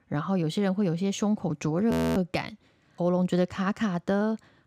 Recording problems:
audio freezing; at 2 s

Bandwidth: 15 kHz